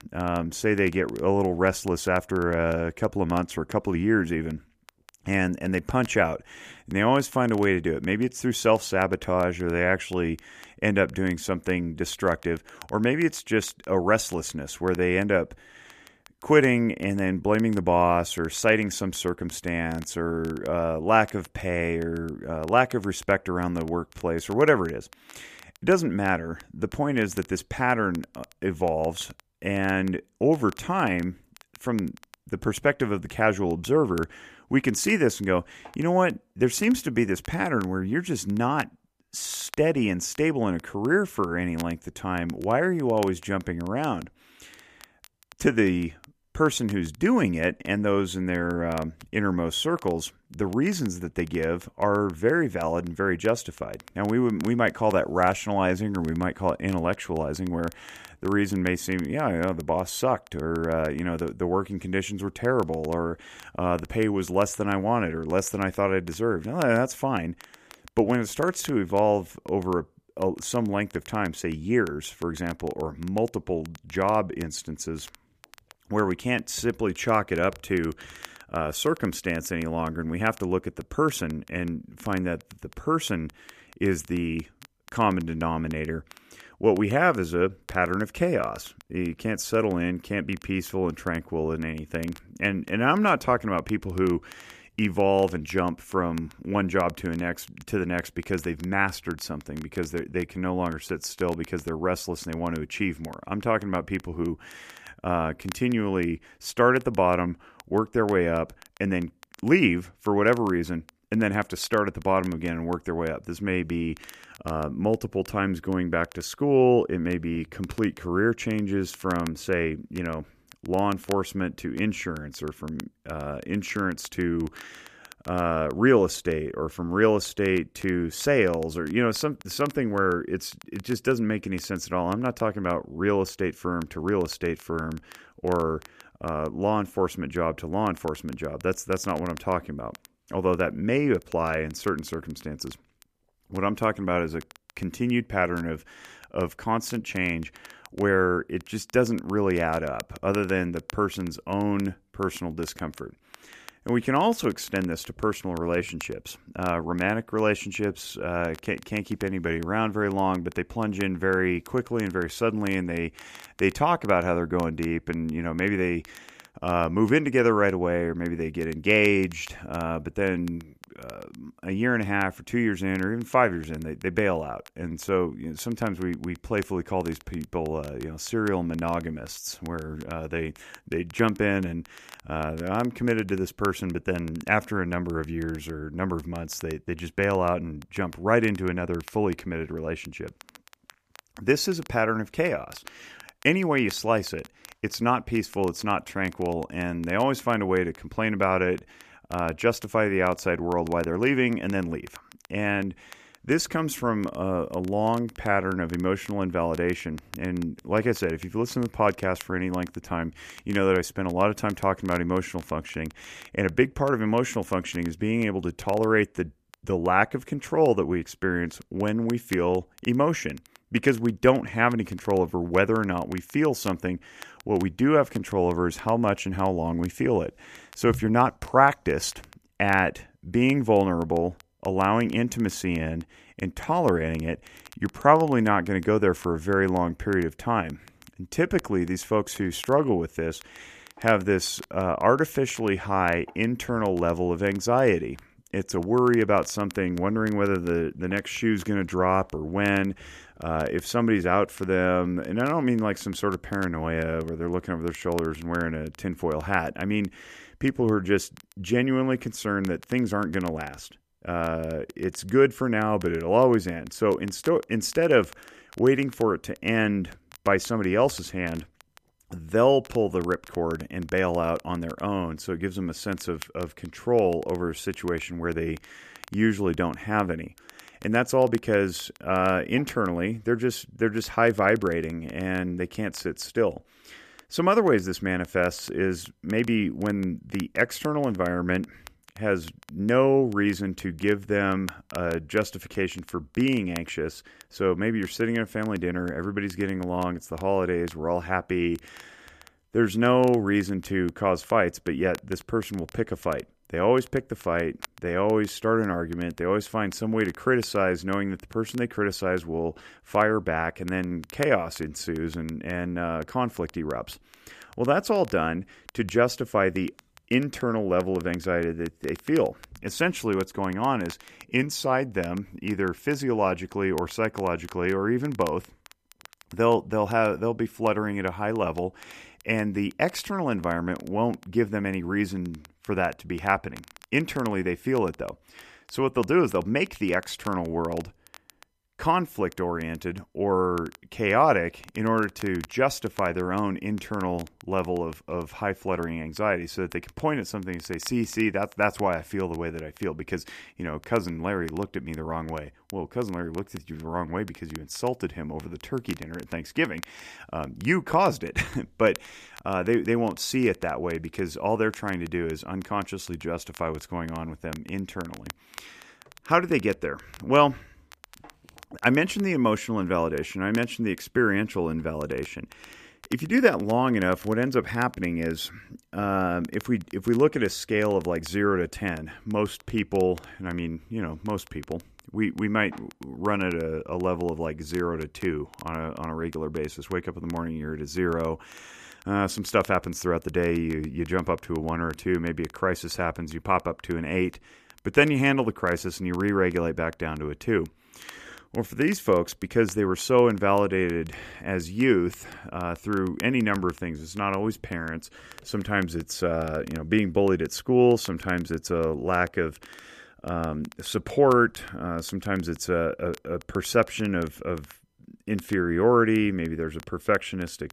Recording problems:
crackle, like an old record; faint; 25 dB below the speech

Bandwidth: 14.5 kHz